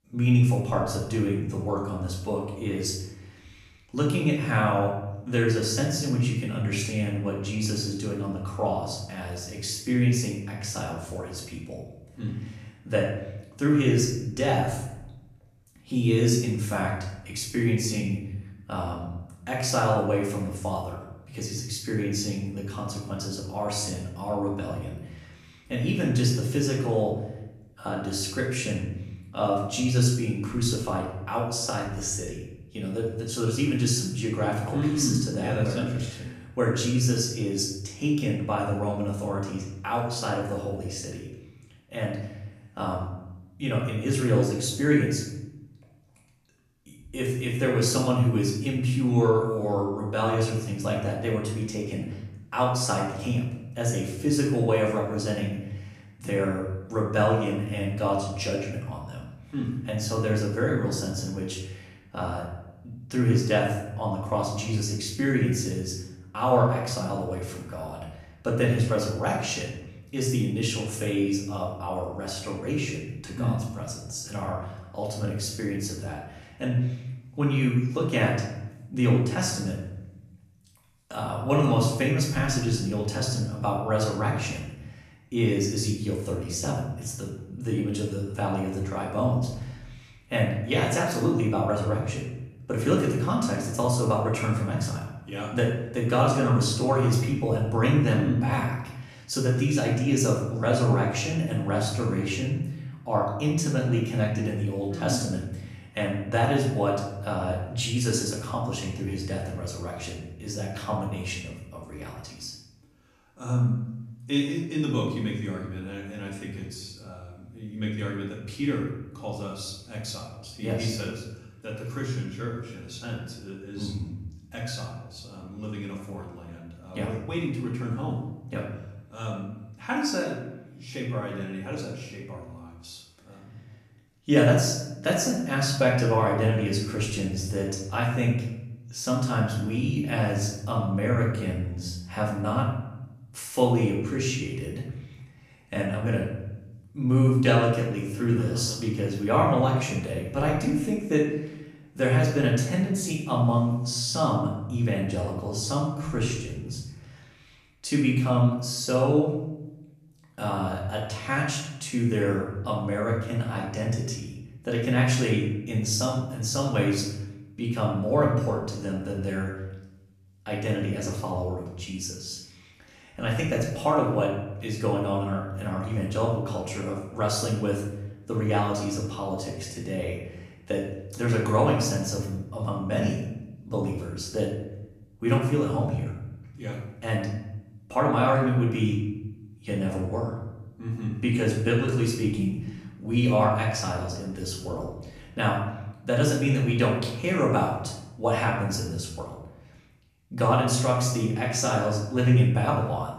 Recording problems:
off-mic speech; far
room echo; noticeable; dies away in 0.9 s

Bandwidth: 14.5 kHz